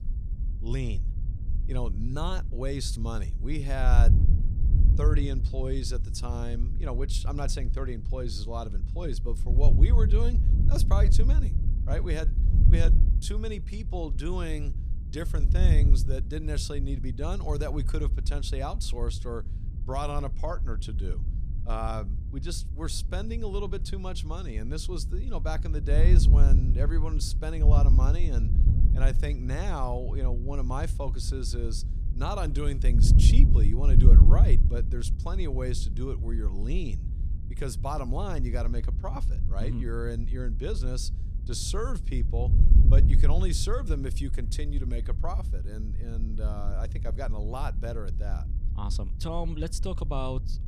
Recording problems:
wind noise on the microphone; heavy; 8 dB below the speech

